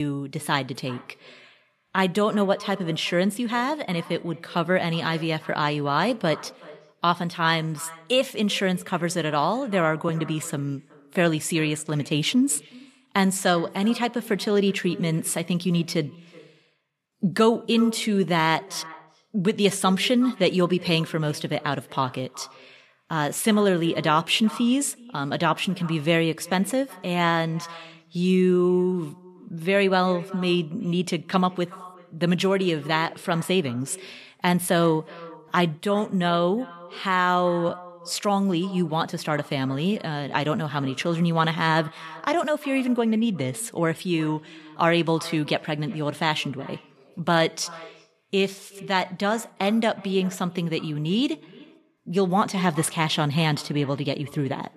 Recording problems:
echo of what is said; faint; throughout; 370 ms later, 20 dB below the speech
abrupt cut into speech; at the start

